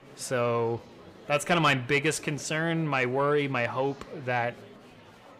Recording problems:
distortion; slight; 10 dB below the speech
murmuring crowd; faint; throughout; 20 dB below the speech

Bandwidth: 15.5 kHz